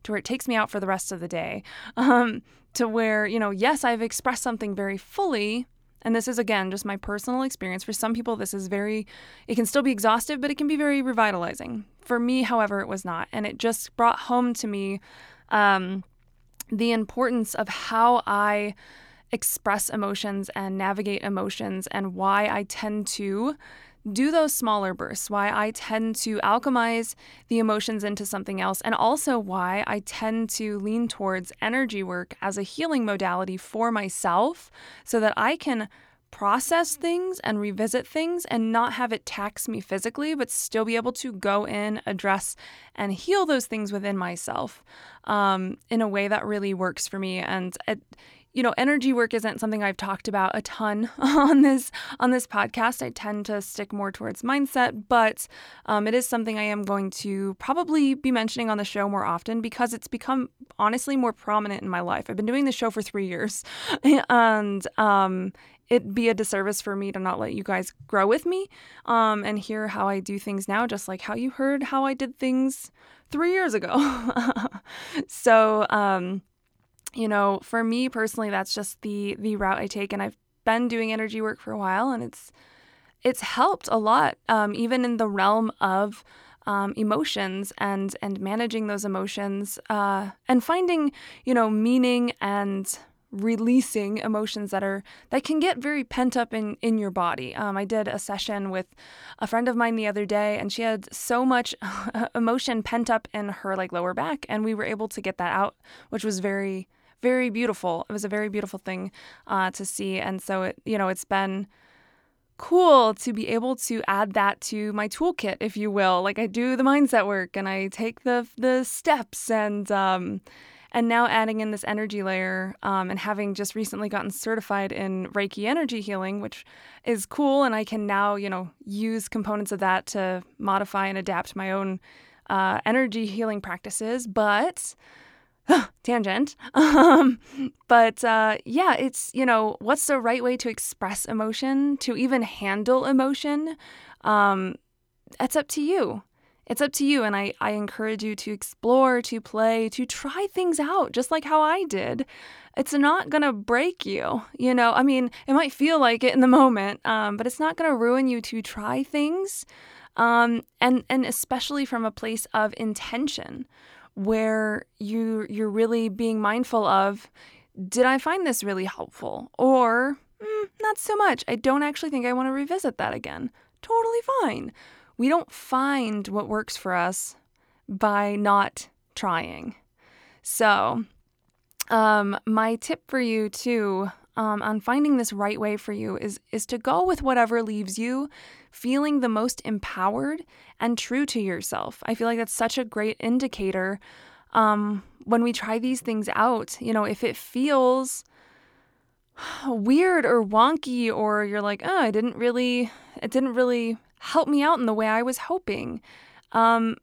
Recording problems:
none

